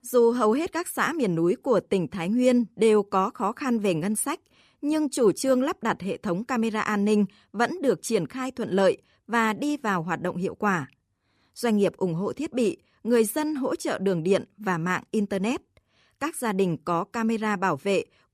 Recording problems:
none

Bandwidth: 14.5 kHz